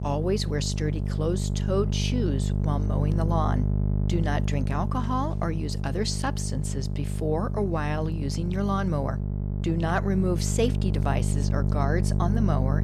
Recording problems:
electrical hum; loud; throughout; 50 Hz, 8 dB below the speech

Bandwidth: 13.5 kHz